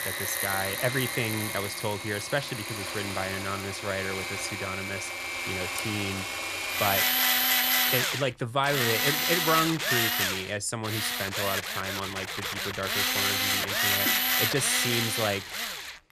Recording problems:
machinery noise; very loud; throughout; 4 dB above the speech

